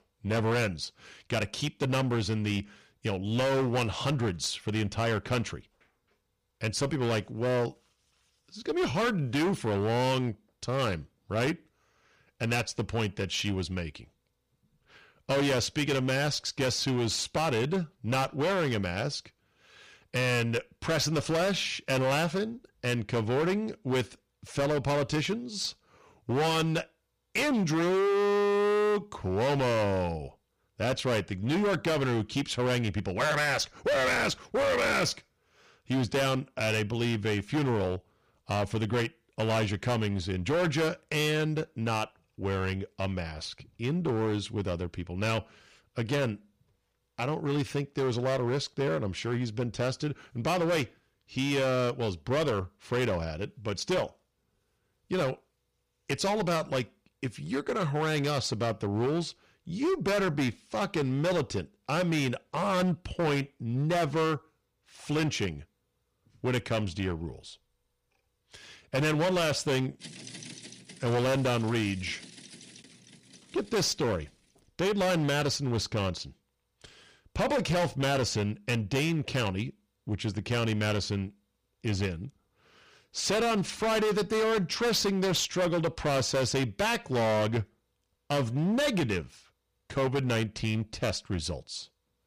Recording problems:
distortion; heavy; 16% of the sound clipped

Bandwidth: 15 kHz